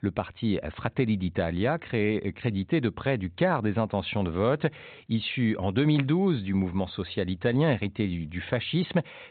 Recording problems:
high frequencies cut off; severe; nothing above 4 kHz

